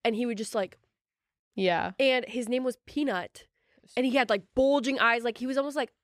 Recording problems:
none

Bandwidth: 14.5 kHz